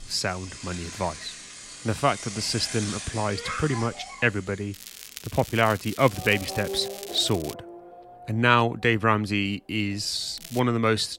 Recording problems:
traffic noise; noticeable; throughout; 10 dB below the speech
crackling; noticeable; from 4.5 to 7.5 s and at 10 s; 15 dB below the speech

